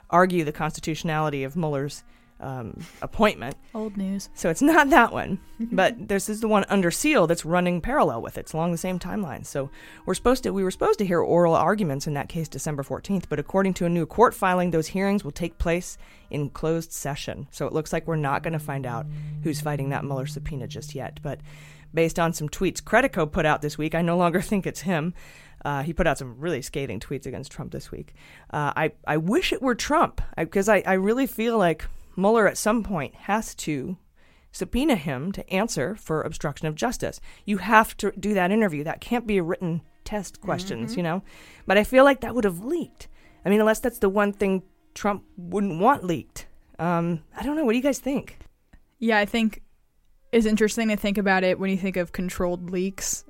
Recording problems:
background music; noticeable; throughout; 15 dB below the speech

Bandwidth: 16 kHz